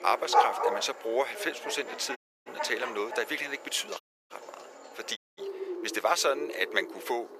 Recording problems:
thin; very; fading below 450 Hz
animal sounds; loud; throughout; 3 dB below the speech
audio cutting out; at 2 s, at 4 s and at 5 s

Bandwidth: 14.5 kHz